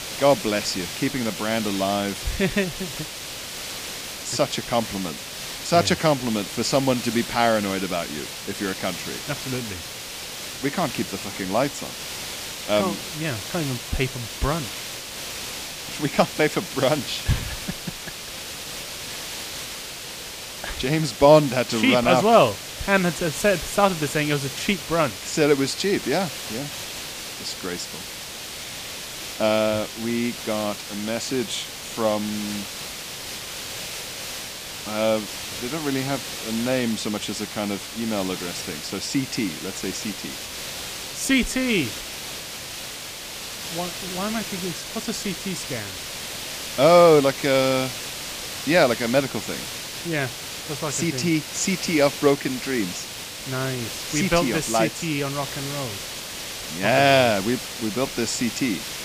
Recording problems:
hiss; loud; throughout; 8 dB below the speech

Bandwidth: 15 kHz